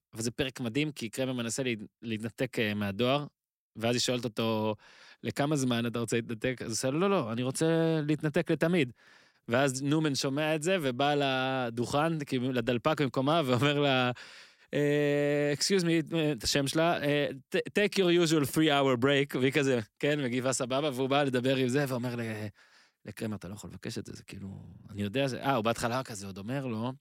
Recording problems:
none

